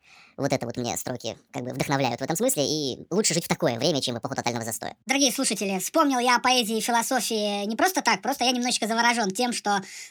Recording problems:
wrong speed and pitch; too fast and too high; 1.5 times normal speed

